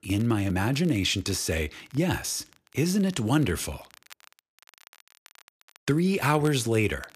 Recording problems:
crackle, like an old record; faint; 25 dB below the speech

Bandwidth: 14.5 kHz